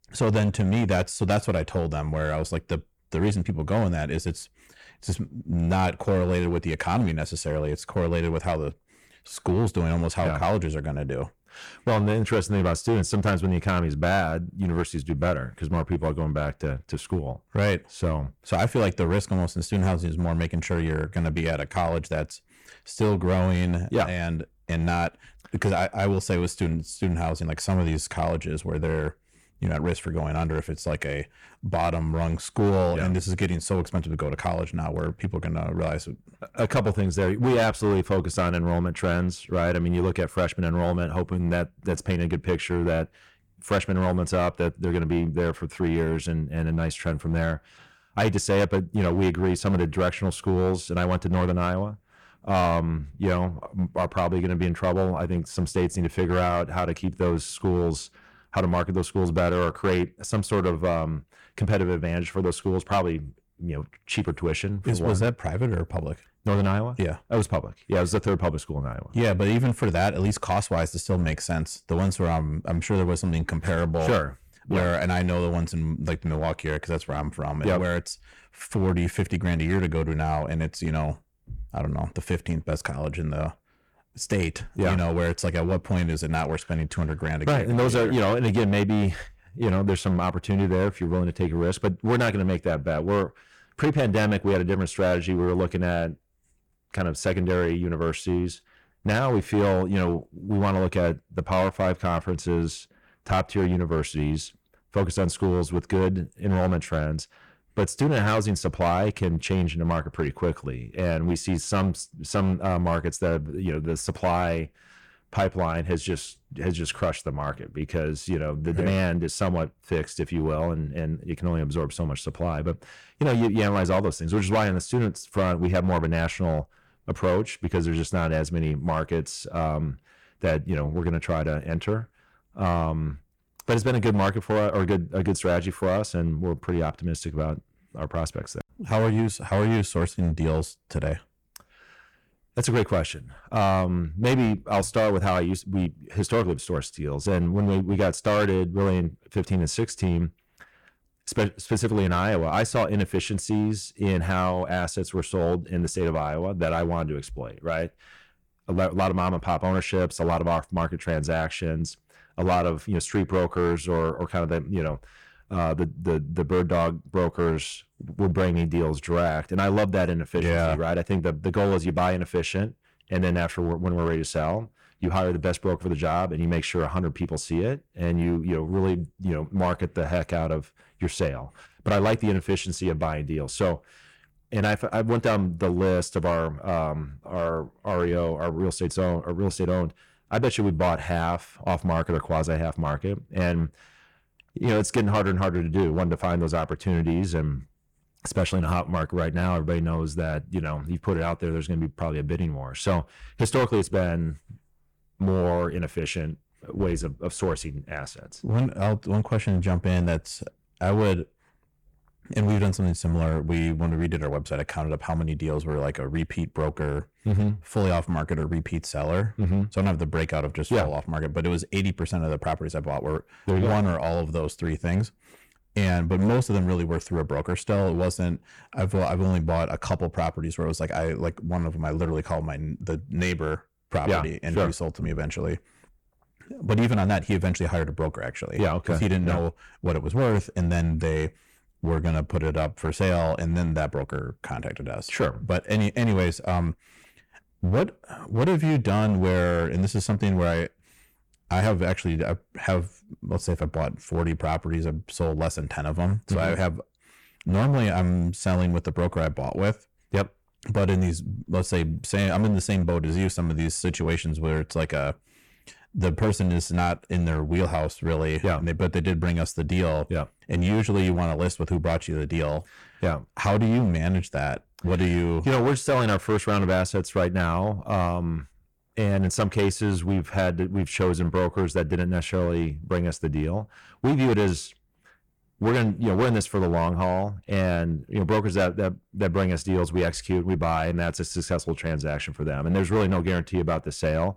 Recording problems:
distortion; slight; 7% of the sound clipped

